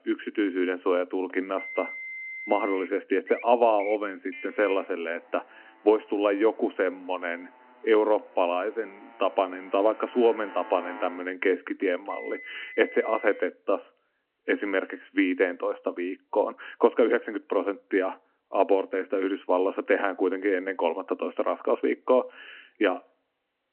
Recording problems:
phone-call audio
traffic noise; noticeable; until 13 s; 15 dB below the speech

